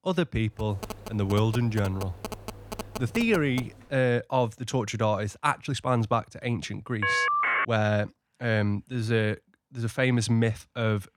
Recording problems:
phone ringing; noticeable; from 0.5 to 3.5 s; peak 10 dB below the speech
uneven, jittery; slightly; from 3 to 11 s
phone ringing; loud; at 7 s; peak 4 dB above the speech

